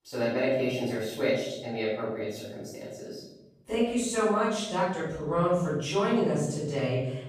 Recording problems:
room echo; strong; dies away in 1.1 s
off-mic speech; far

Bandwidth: 15 kHz